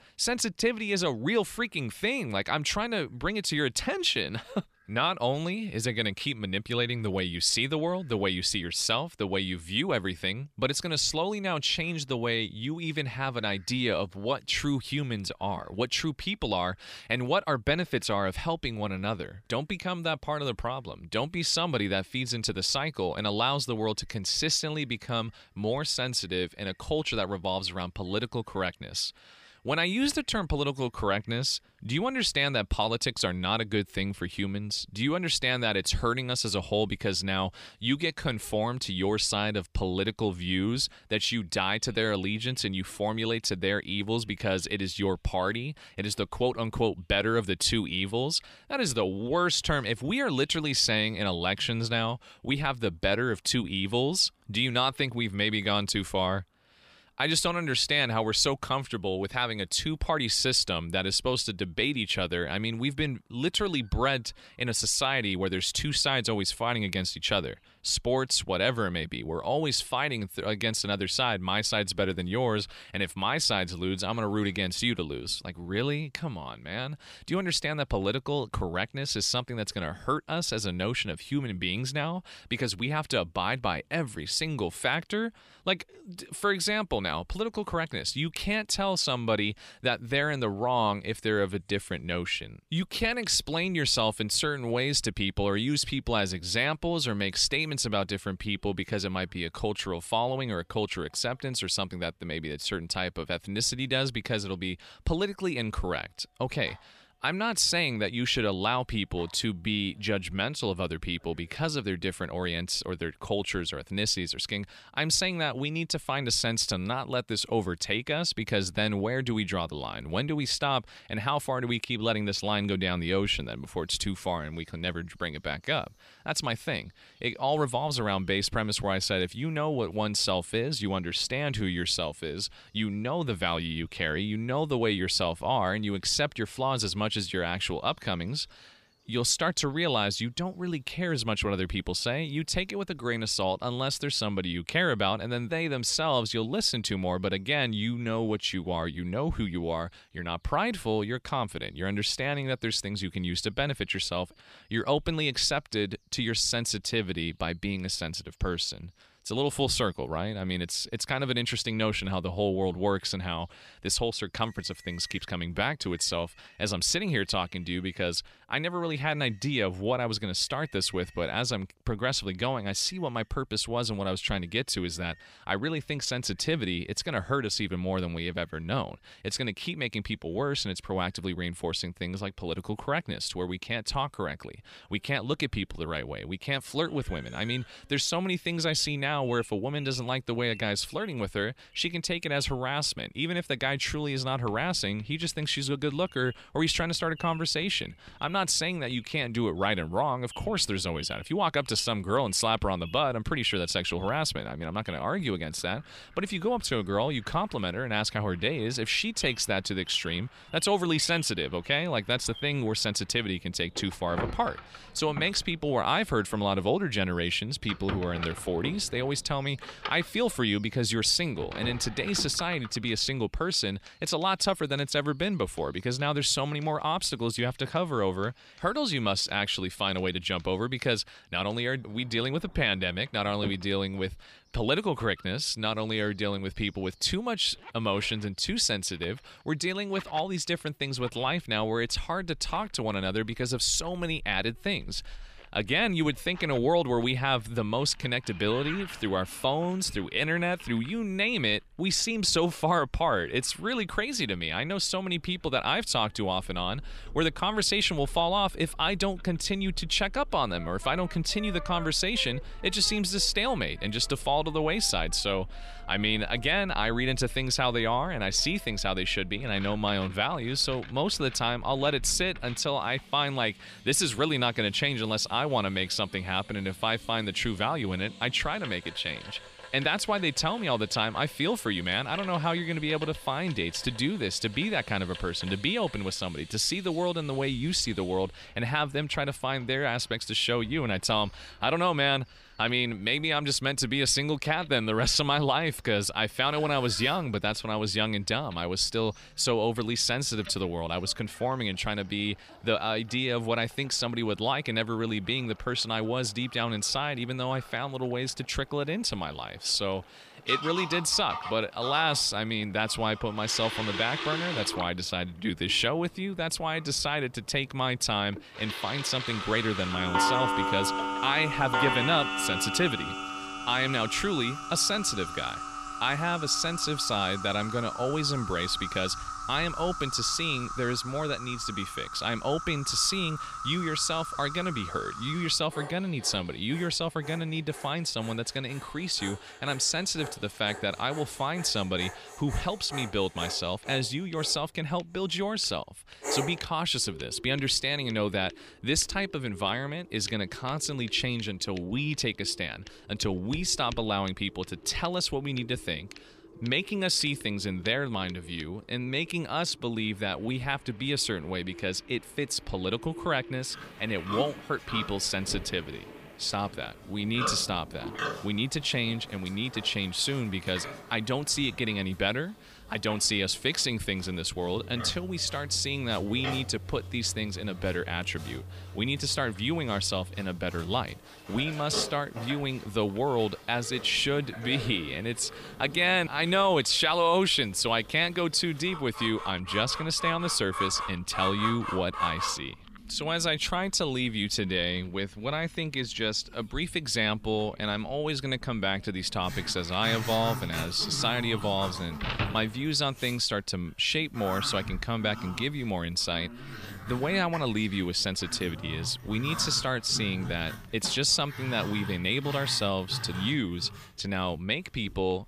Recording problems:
animal sounds; noticeable; throughout; 15 dB below the speech
household noises; noticeable; from 3:13 on; 10 dB below the speech

